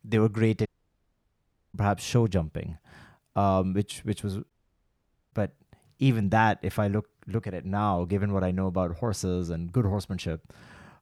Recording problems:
audio cutting out; at 0.5 s for 1 s and at 4.5 s for 1 s

